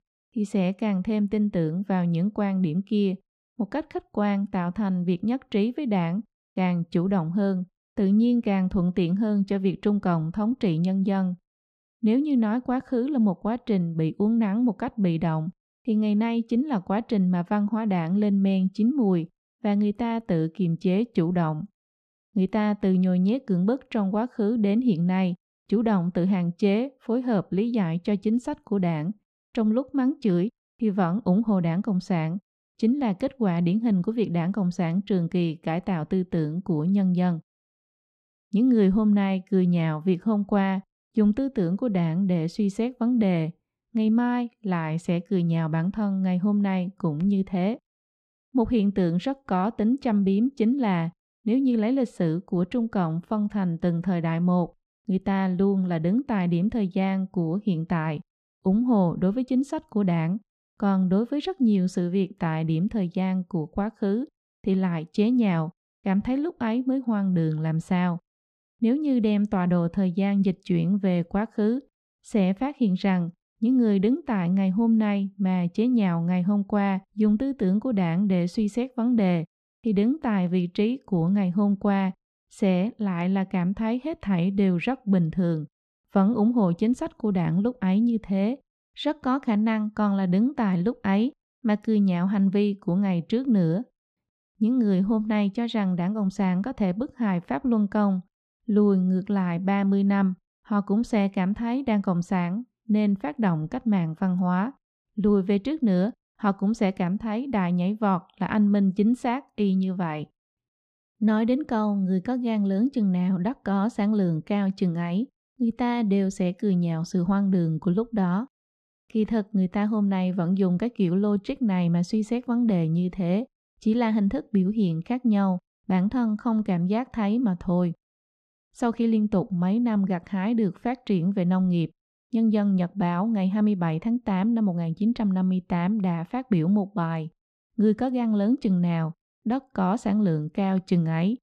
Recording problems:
muffled; slightly; fading above 3.5 kHz

